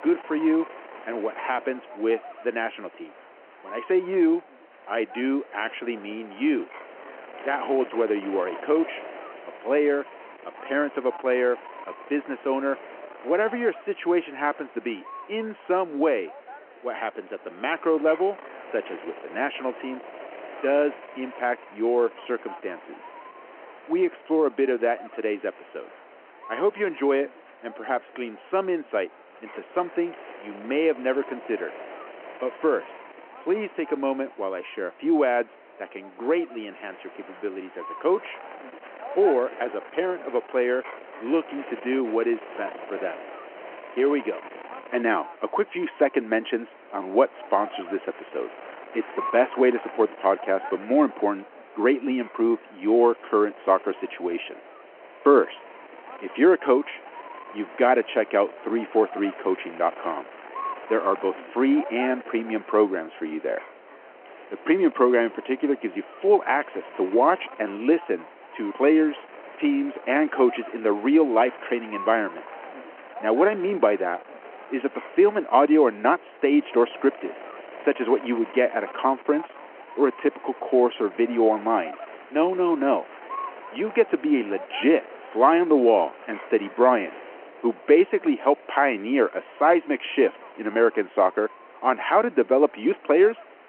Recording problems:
phone-call audio
wind noise on the microphone; occasional gusts; 15 dB below the speech

